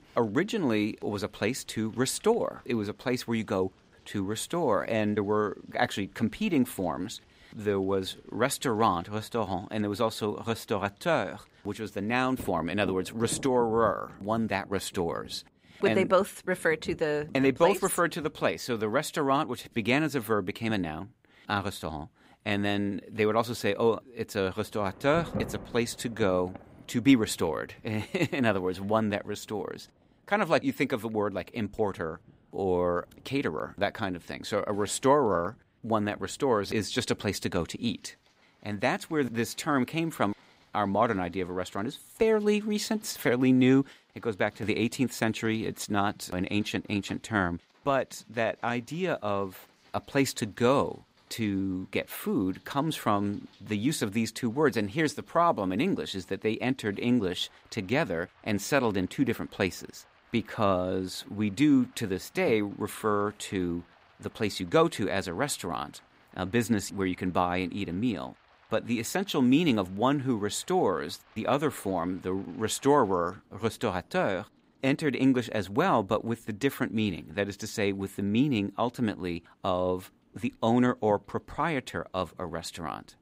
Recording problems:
rain or running water; faint; throughout; 25 dB below the speech

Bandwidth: 15.5 kHz